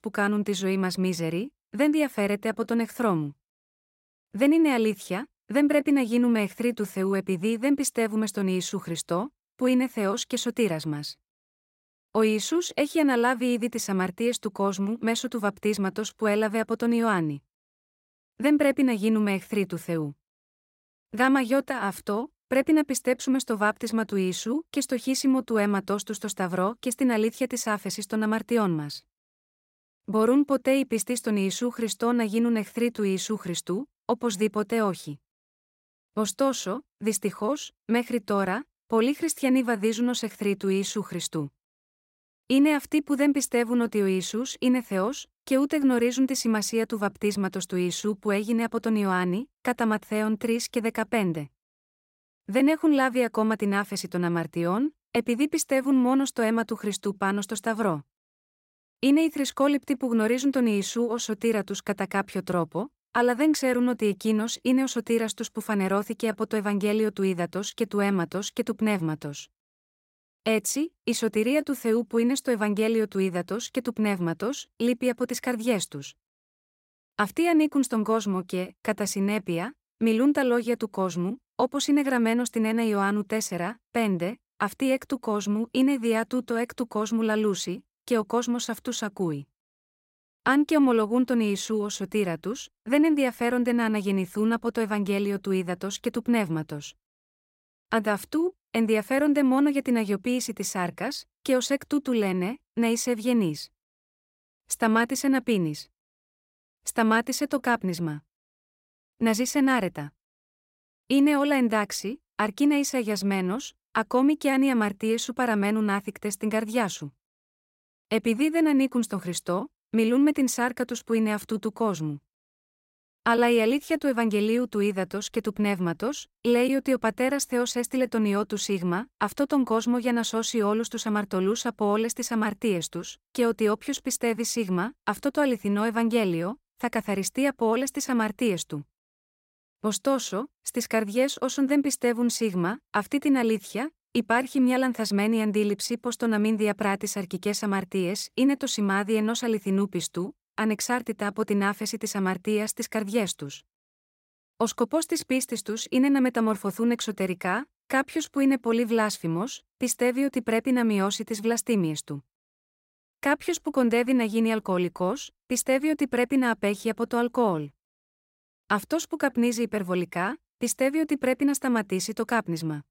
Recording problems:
none

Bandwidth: 16 kHz